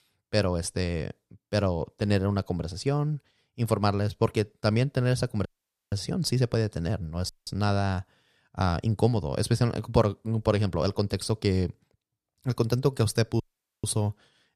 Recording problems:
audio cutting out; at 5.5 s, at 7.5 s and at 13 s

